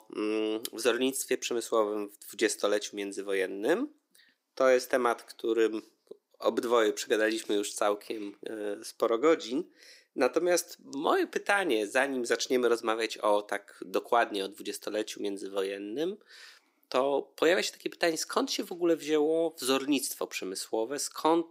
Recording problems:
thin; somewhat; fading below 300 Hz

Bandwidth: 15.5 kHz